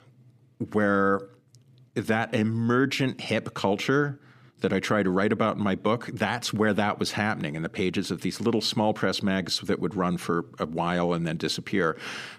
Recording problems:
none

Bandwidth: 15 kHz